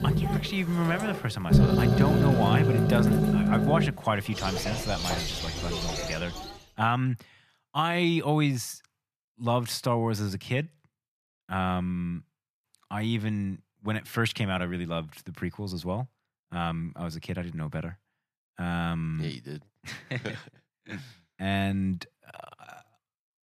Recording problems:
animal sounds; very loud; until 6.5 s; 4 dB above the speech

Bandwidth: 14.5 kHz